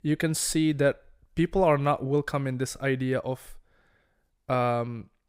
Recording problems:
none

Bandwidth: 15.5 kHz